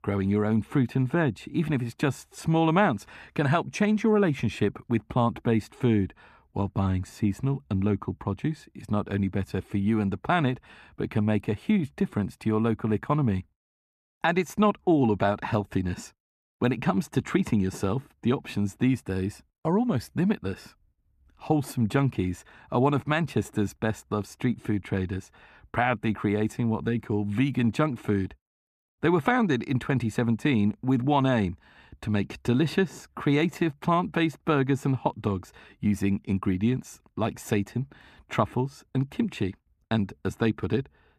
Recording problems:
muffled; slightly; fading above 2.5 kHz

